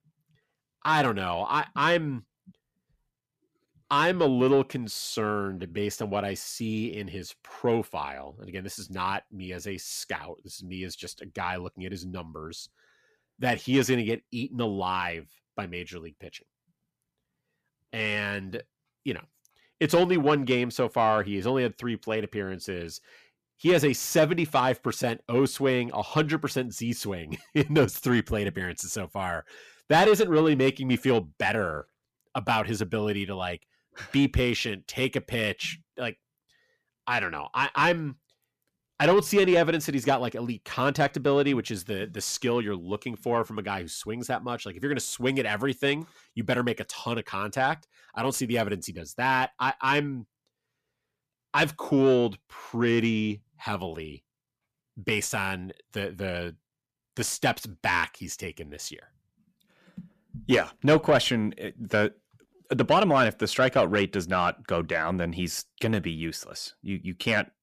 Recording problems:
distortion; slight; 10 dB below the speech

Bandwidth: 14.5 kHz